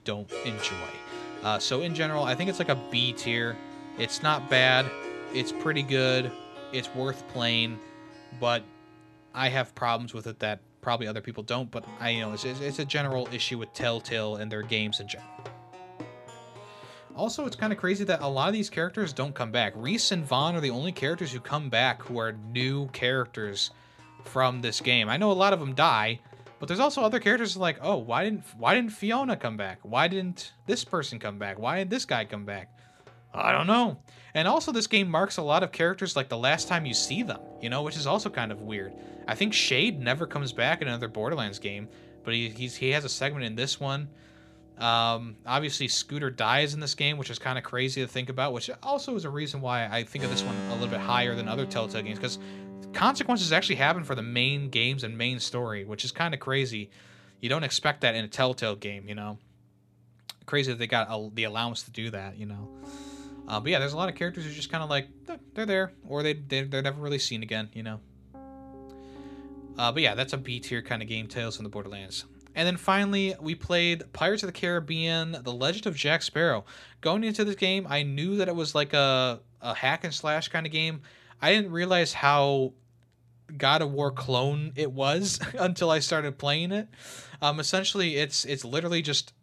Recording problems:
background music; noticeable; throughout; 15 dB below the speech

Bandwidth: 14 kHz